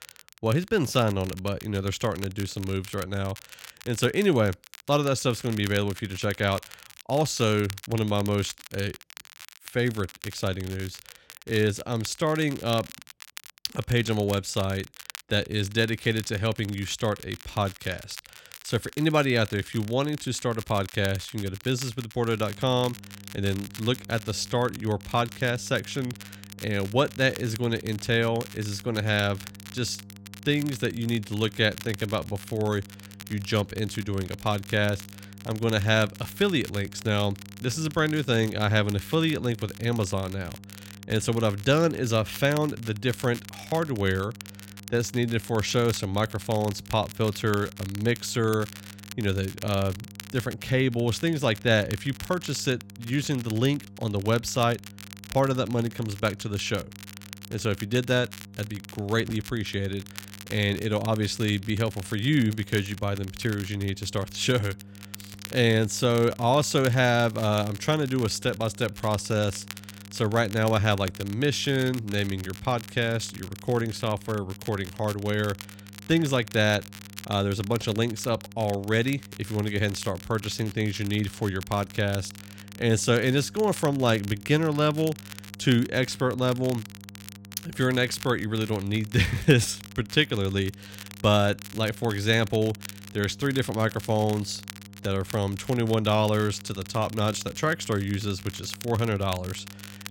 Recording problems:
crackle, like an old record; noticeable; 15 dB below the speech
electrical hum; faint; from 22 s on; 50 Hz, 25 dB below the speech

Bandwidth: 16.5 kHz